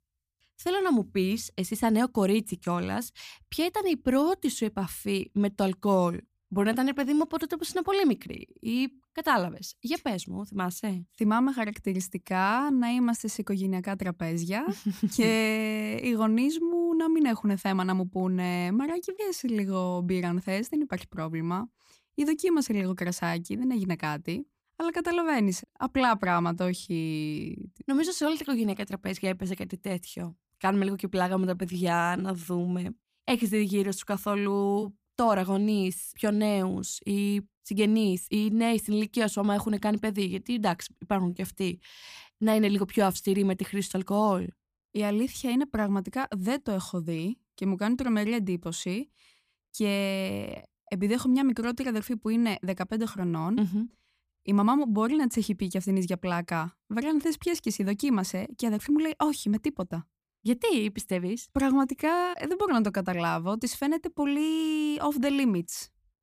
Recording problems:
uneven, jittery; strongly; from 8.5 s to 1:02

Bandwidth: 15 kHz